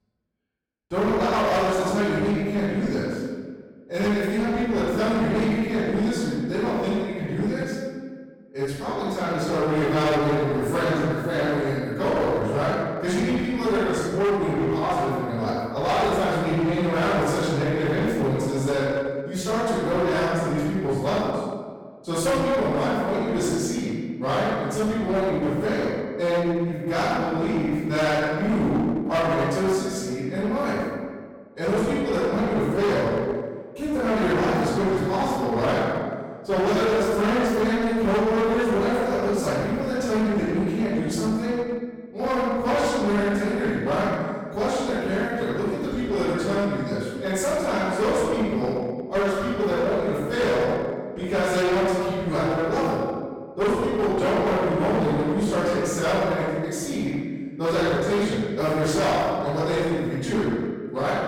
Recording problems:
distortion; heavy; 22% of the sound clipped
room echo; strong; dies away in 1.4 s
off-mic speech; far

